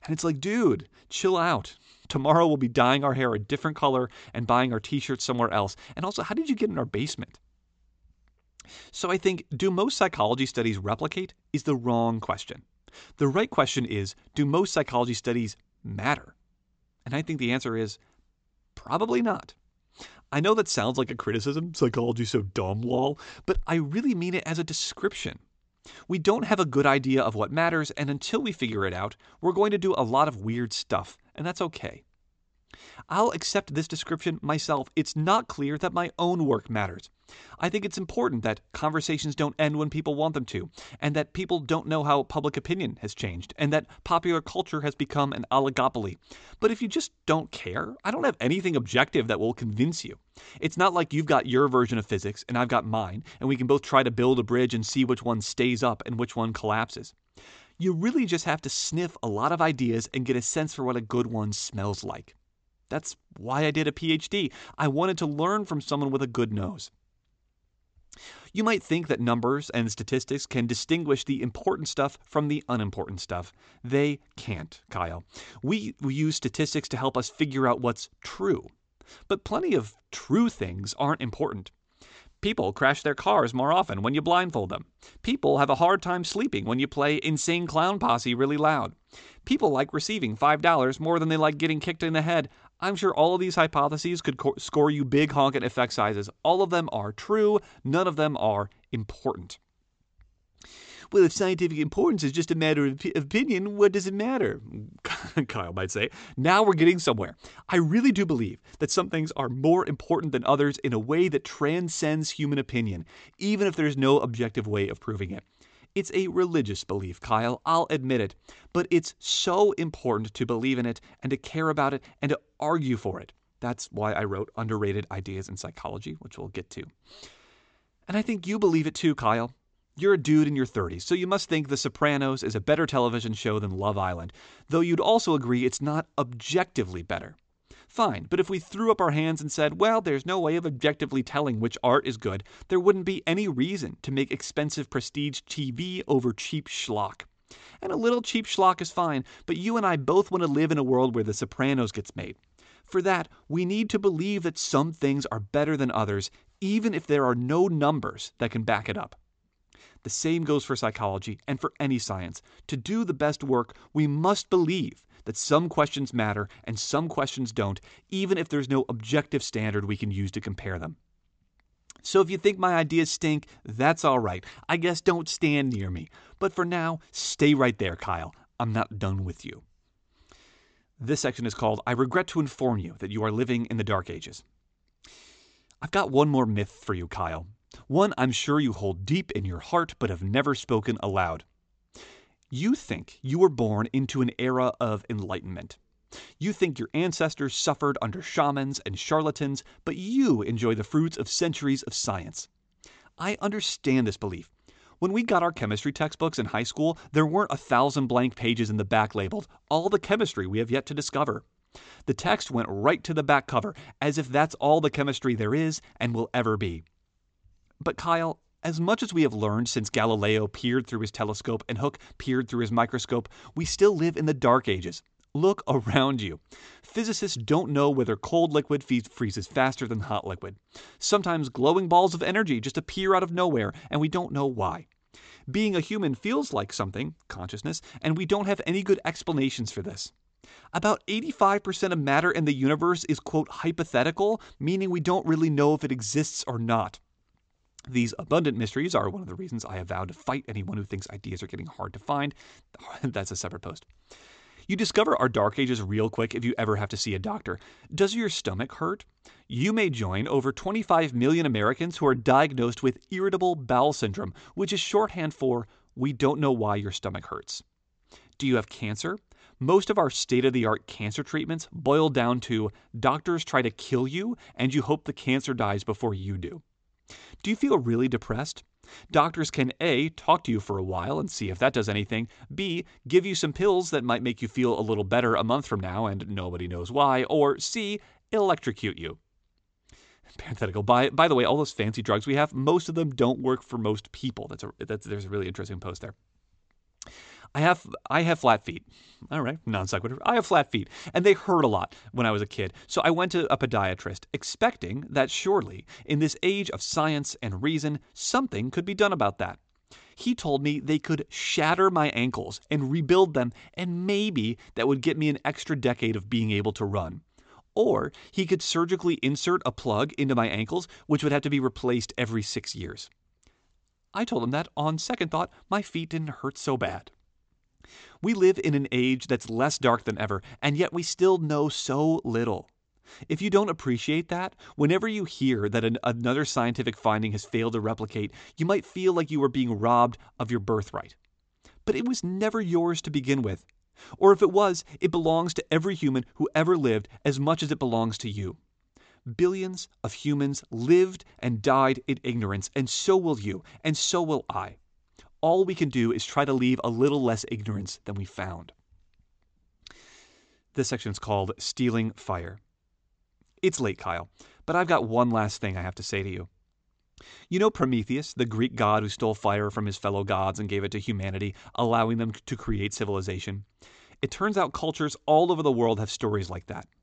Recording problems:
high frequencies cut off; noticeable; nothing above 8 kHz

